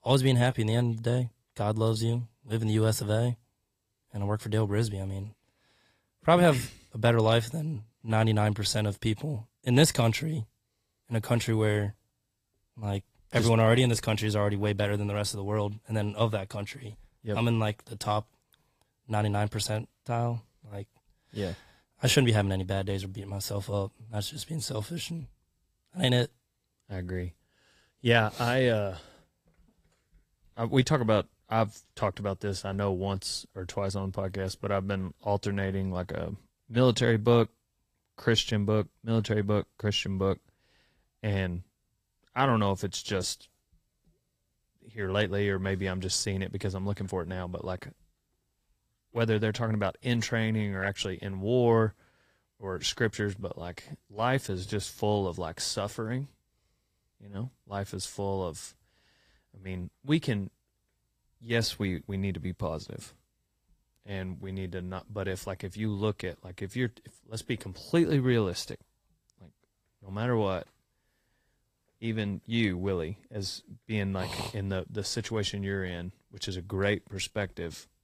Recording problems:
garbled, watery; slightly; nothing above 15.5 kHz

